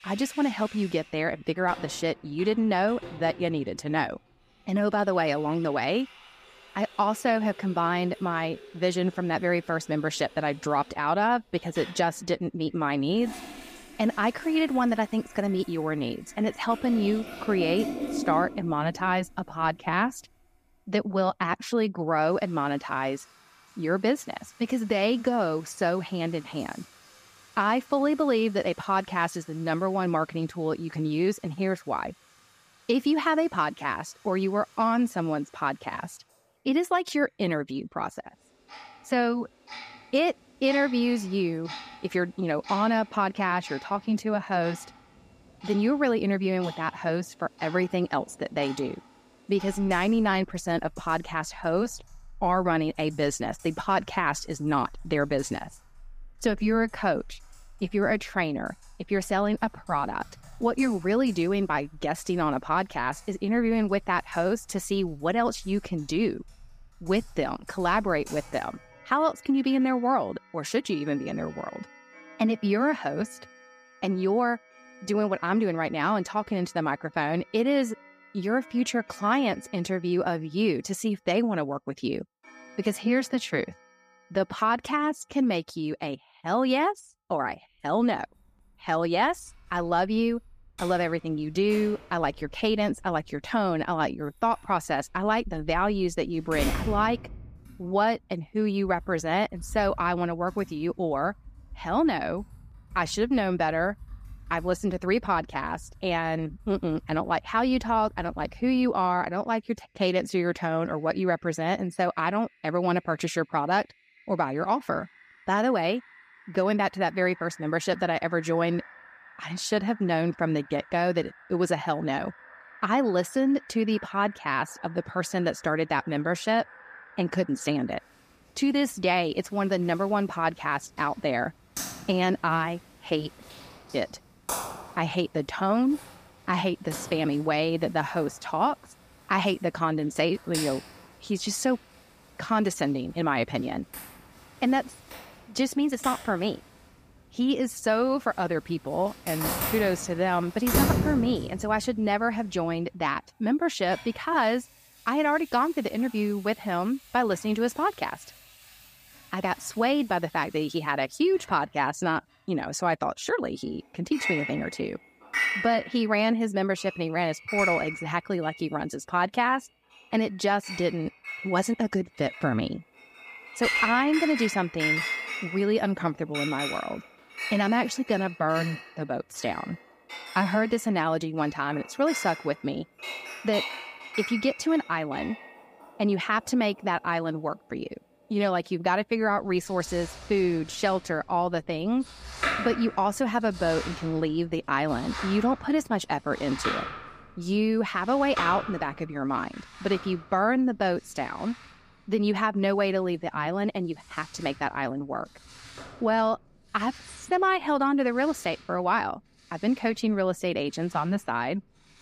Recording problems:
household noises; noticeable; throughout; 10 dB below the speech

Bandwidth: 15 kHz